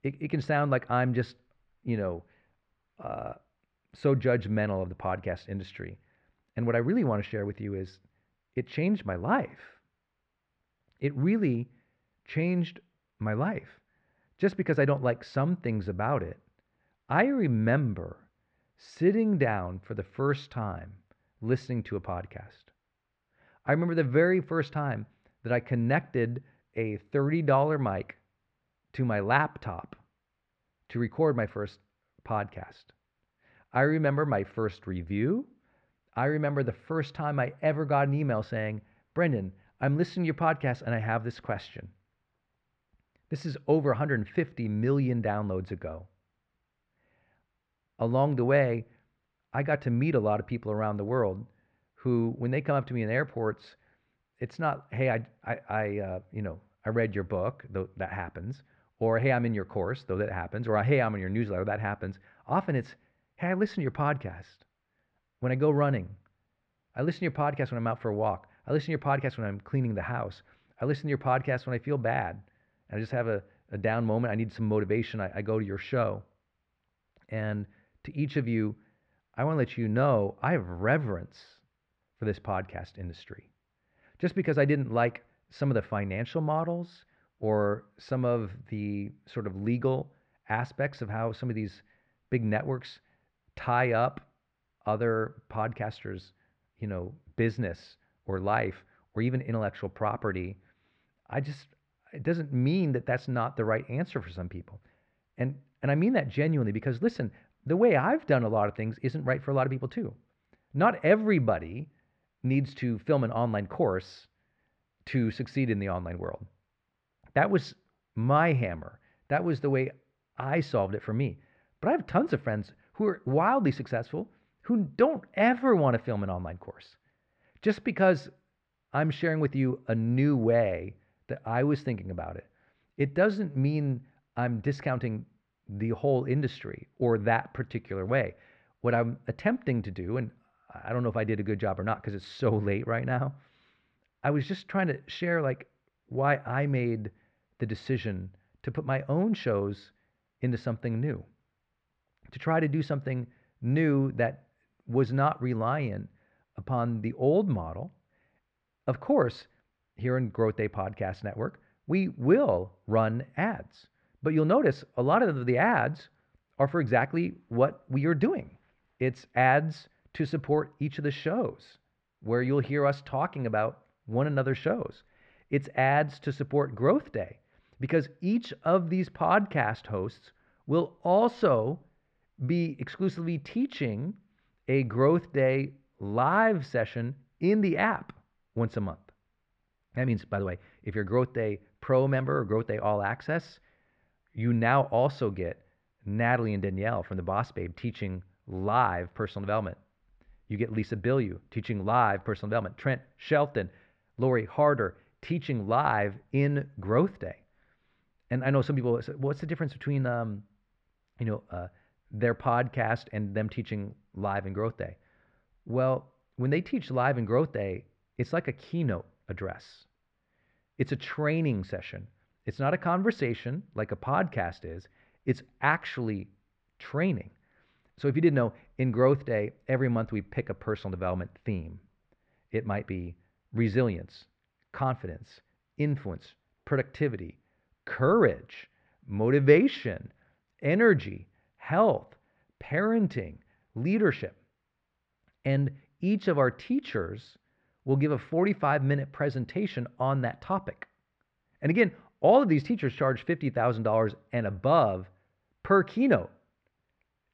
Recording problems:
muffled; very; fading above 2 kHz

